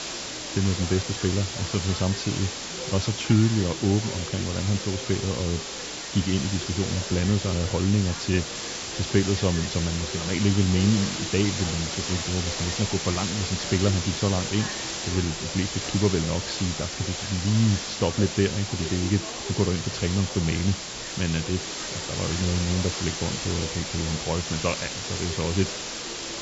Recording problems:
high frequencies cut off; noticeable; nothing above 8 kHz
hiss; loud; throughout; 4 dB below the speech
chatter from many people; noticeable; throughout; 15 dB below the speech

